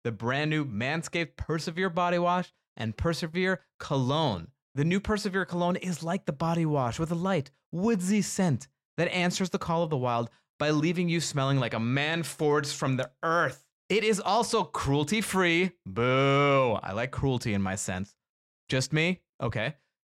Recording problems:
none

